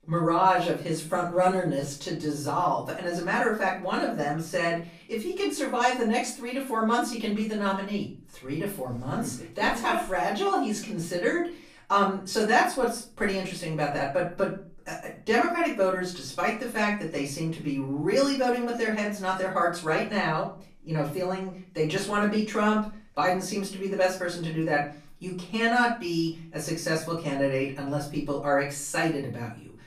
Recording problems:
off-mic speech; far
room echo; slight; dies away in 0.4 s

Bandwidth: 15 kHz